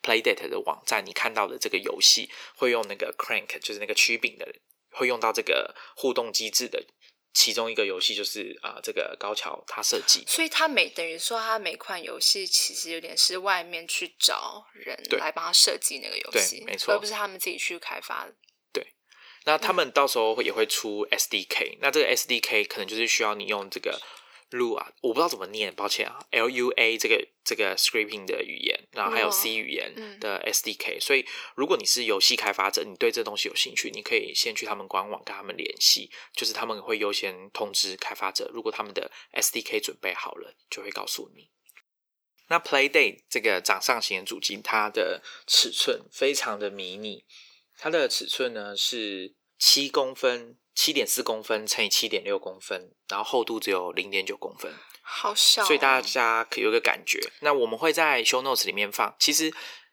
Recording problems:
thin; somewhat; fading below 350 Hz

